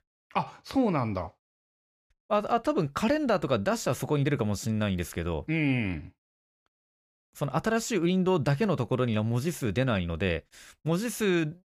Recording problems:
none

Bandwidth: 15 kHz